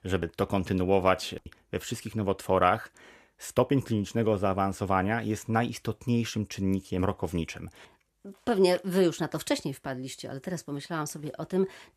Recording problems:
none

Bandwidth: 14.5 kHz